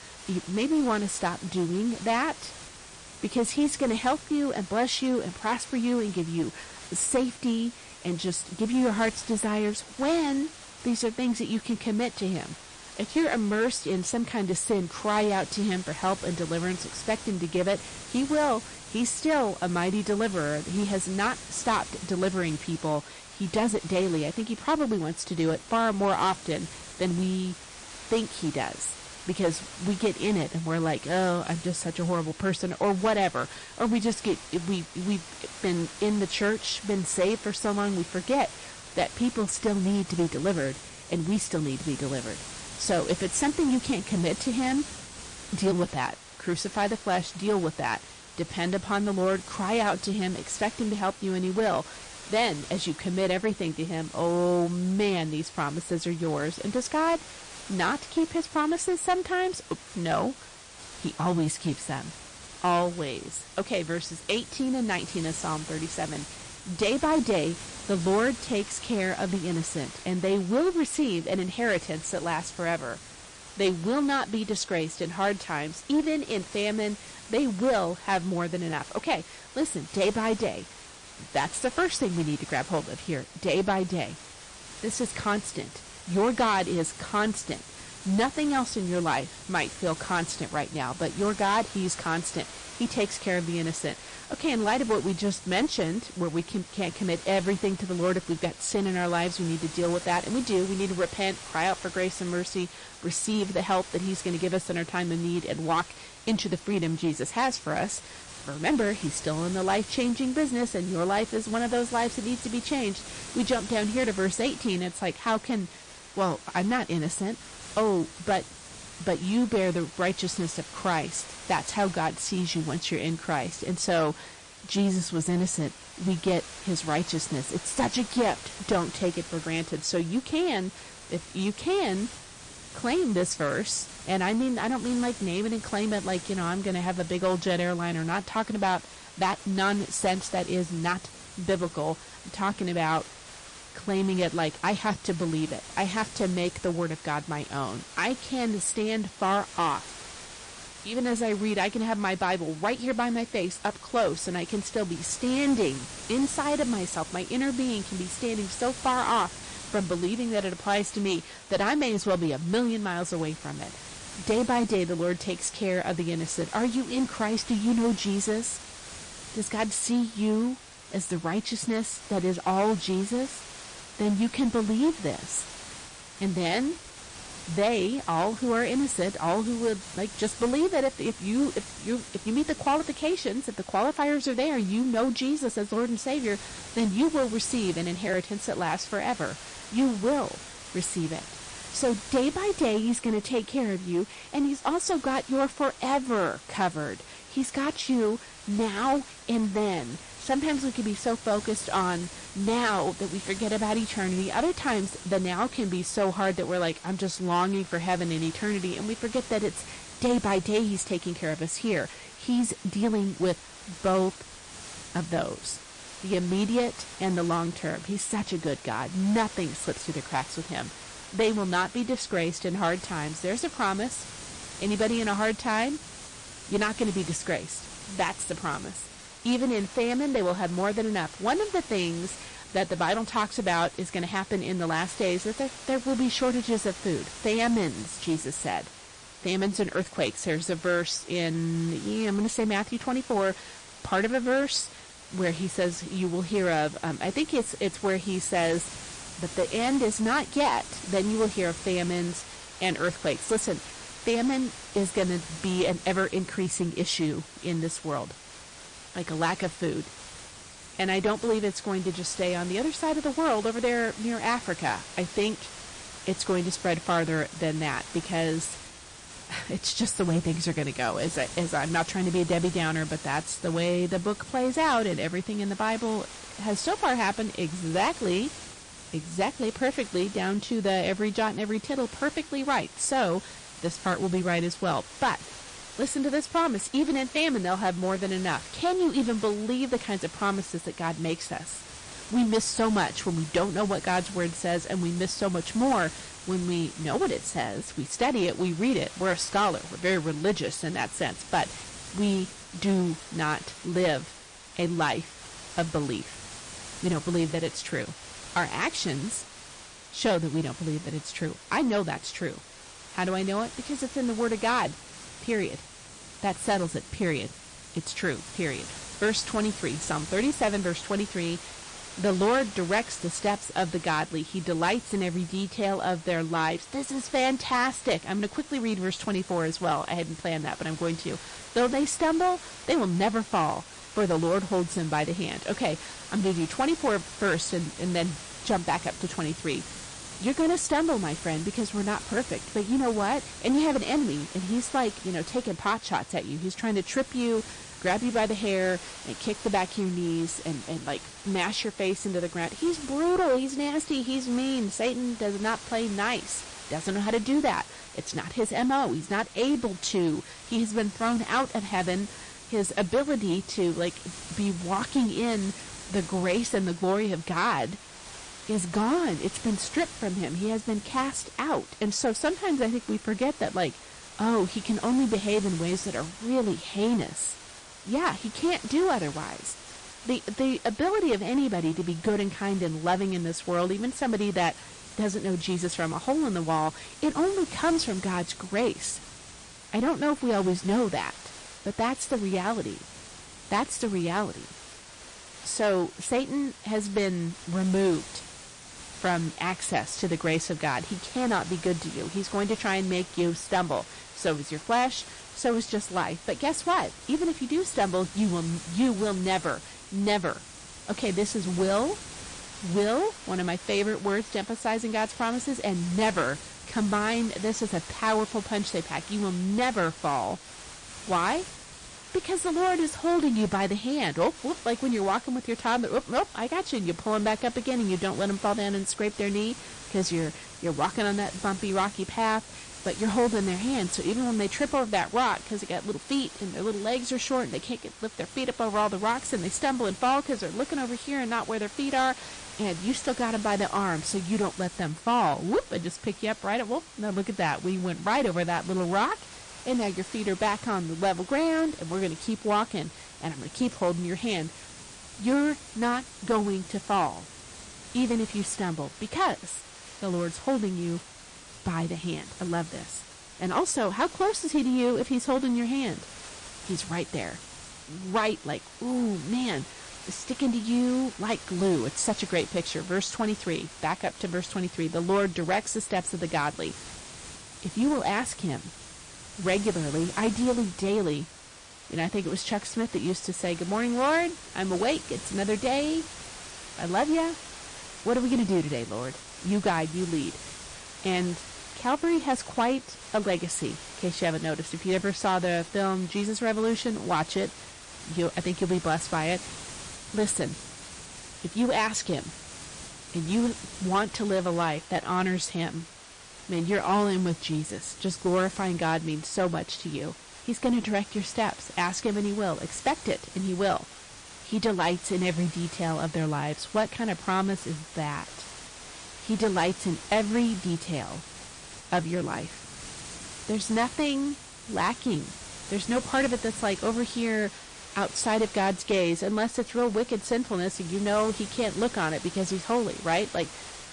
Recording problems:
distortion; slight; 6% of the sound clipped
garbled, watery; slightly; nothing above 8.5 kHz
hiss; noticeable; throughout; 15 dB below the speech

